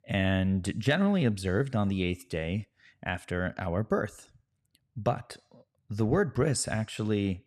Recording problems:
none

